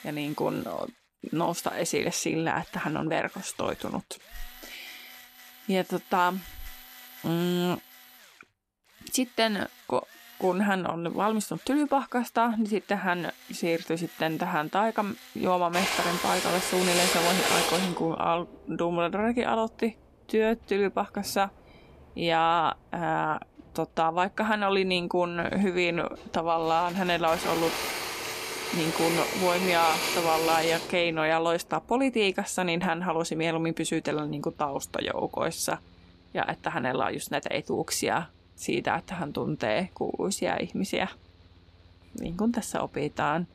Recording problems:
machinery noise; loud; throughout; 2 dB below the speech

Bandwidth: 14.5 kHz